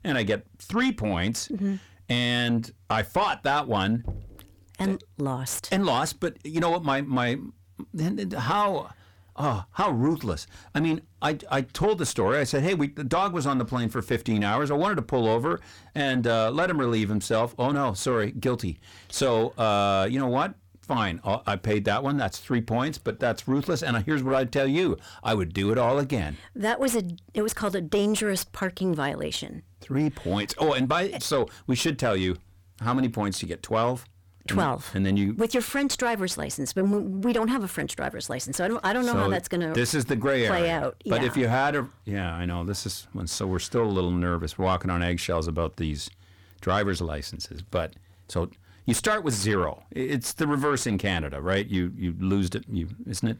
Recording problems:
distortion; slight; 10 dB below the speech
door banging; faint; at 4 s; peak 10 dB below the speech

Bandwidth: 18.5 kHz